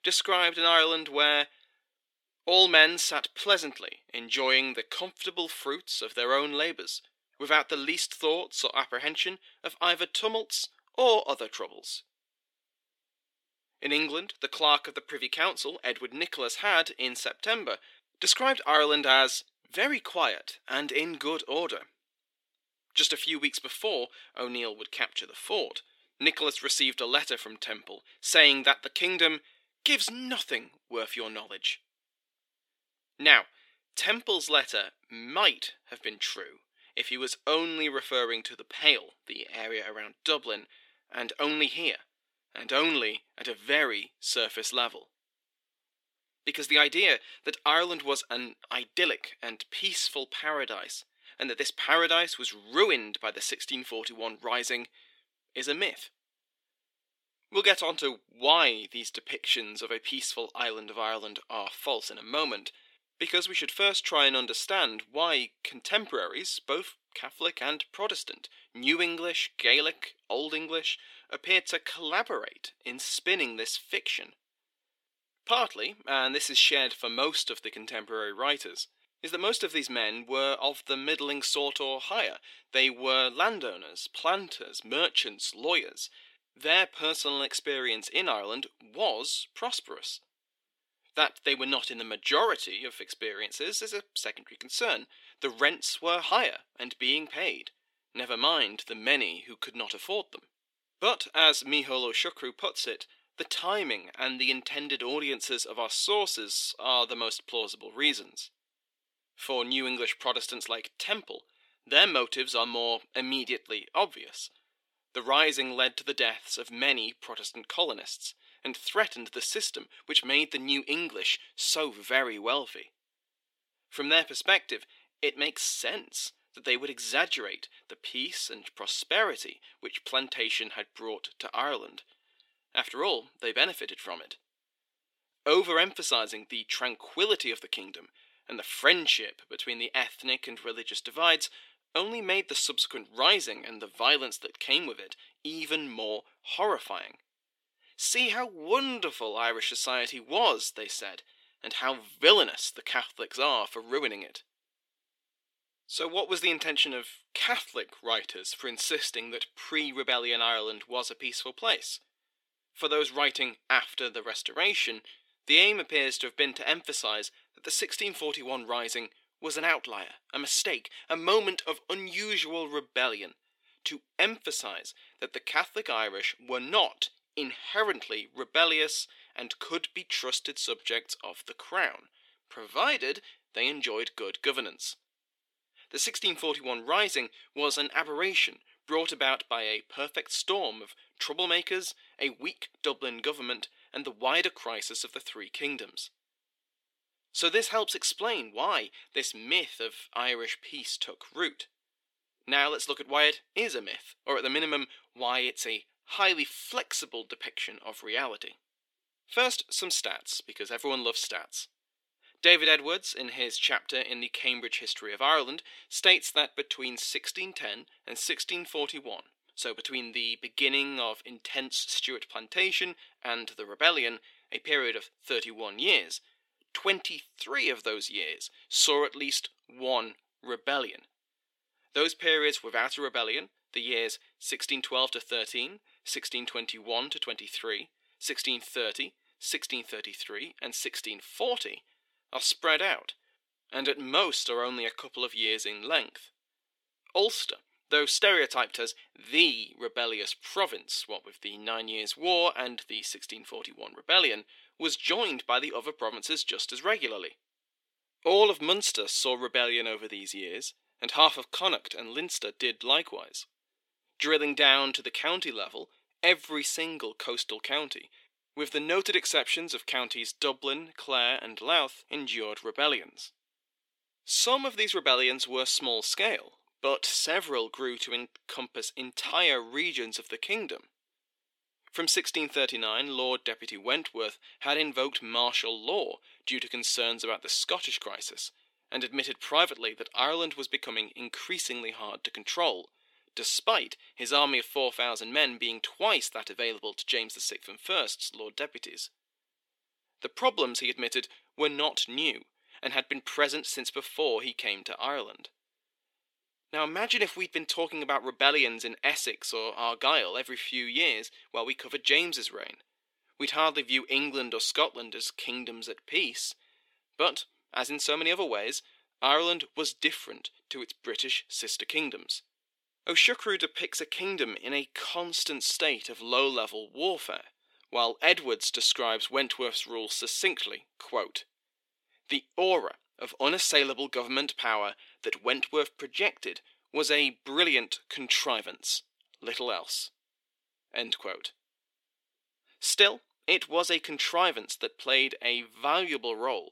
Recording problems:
thin; somewhat; fading below 350 Hz

